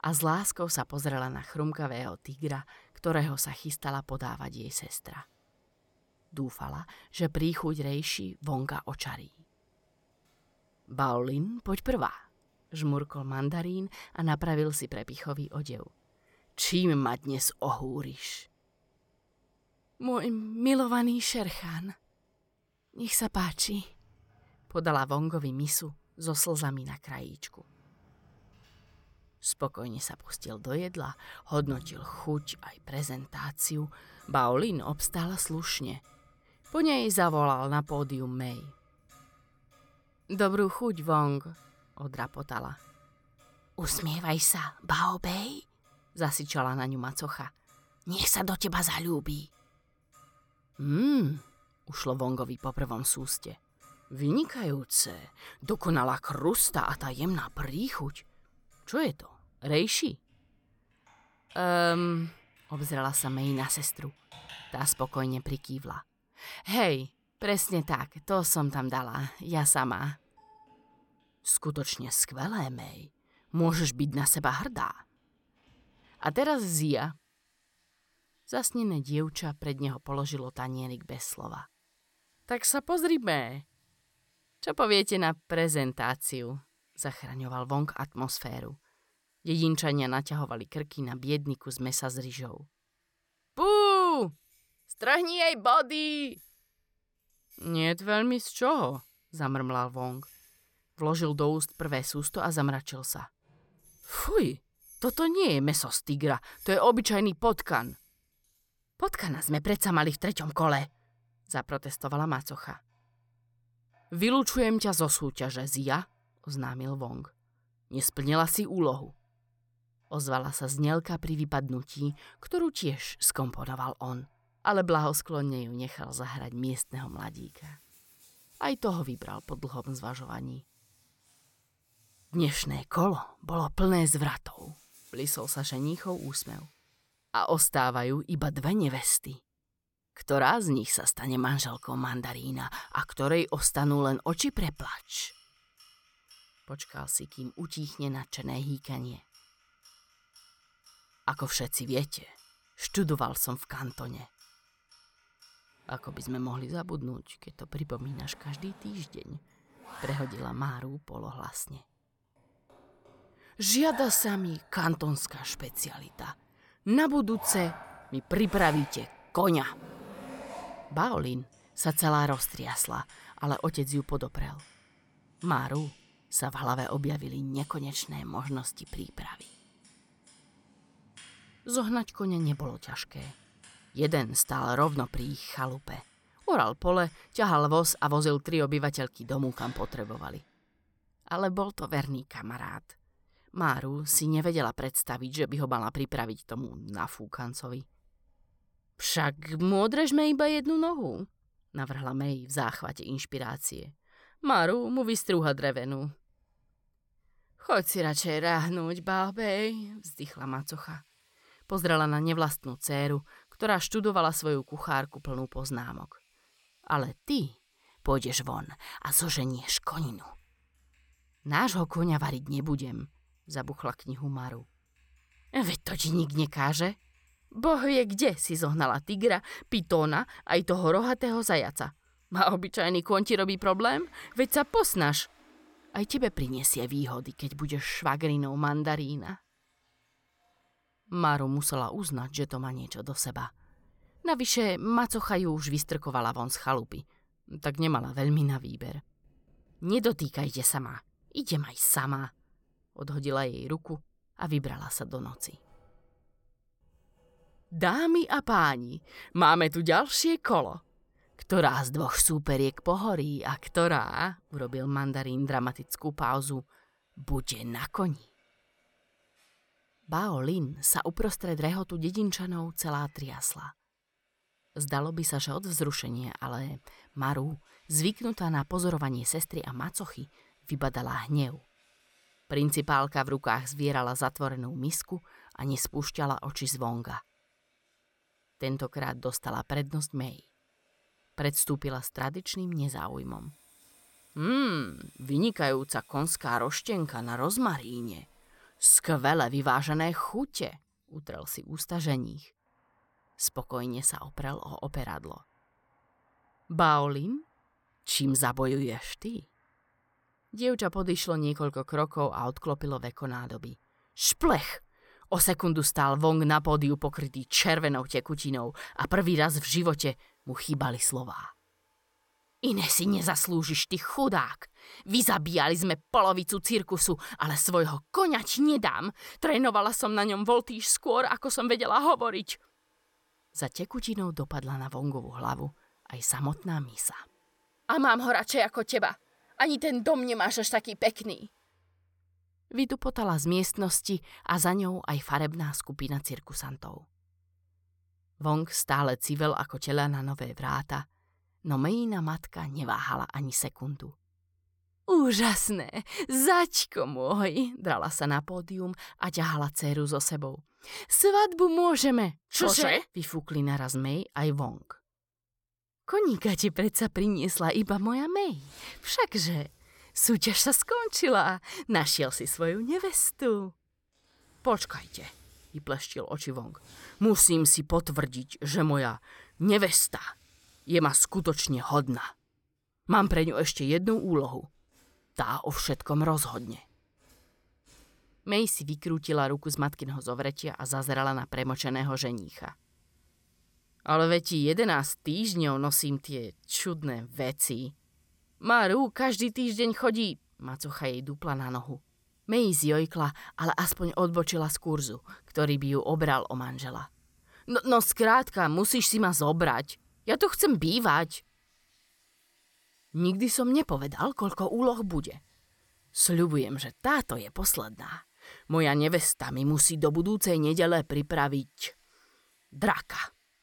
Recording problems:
household noises; faint; throughout; 25 dB below the speech

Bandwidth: 17.5 kHz